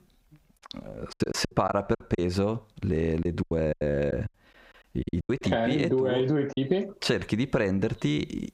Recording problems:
squashed, flat; heavily
choppy; very; from 1 to 2 s, from 3 to 5.5 s and at 6.5 s; 19% of the speech affected

